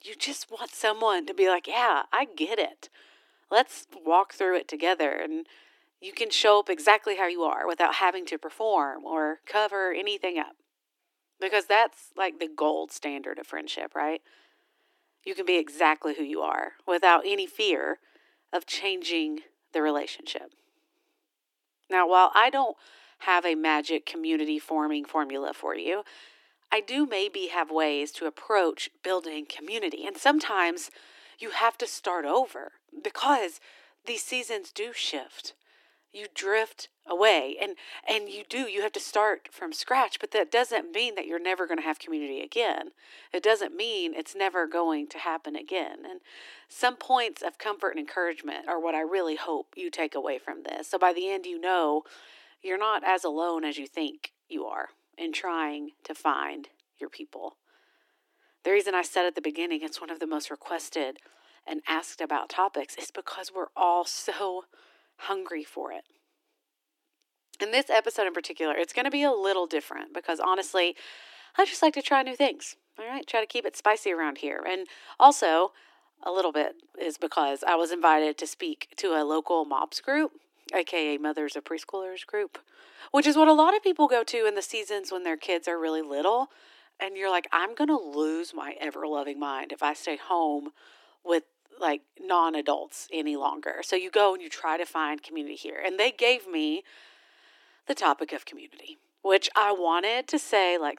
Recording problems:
thin; very; fading below 300 Hz

